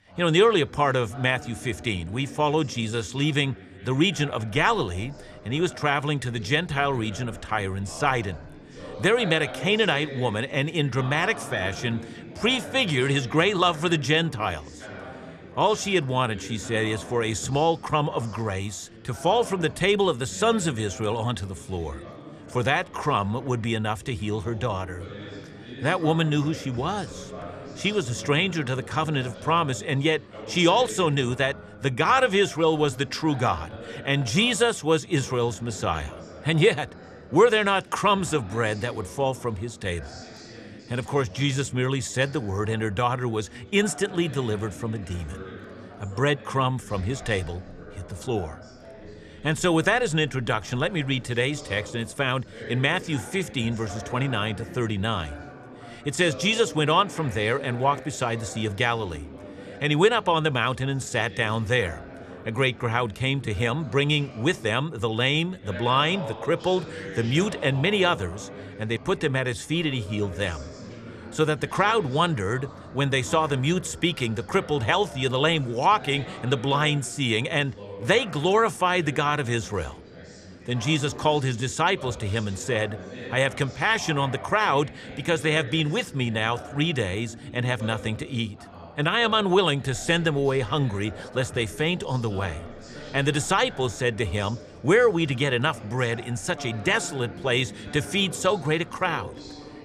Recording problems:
background chatter; noticeable; throughout; 4 voices, 15 dB below the speech

